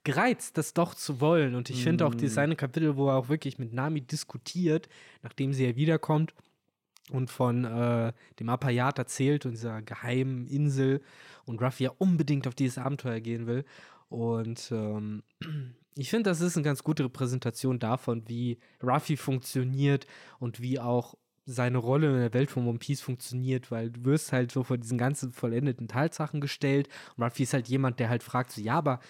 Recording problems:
none

